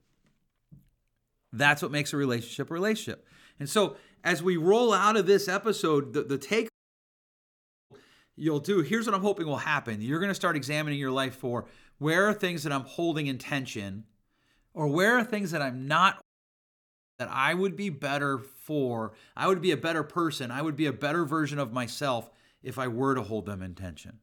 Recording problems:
audio cutting out; at 6.5 s for 1 s and at 16 s for 1 s

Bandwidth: 18.5 kHz